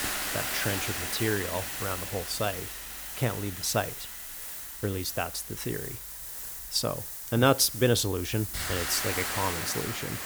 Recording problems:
hiss; loud; throughout; 3 dB below the speech

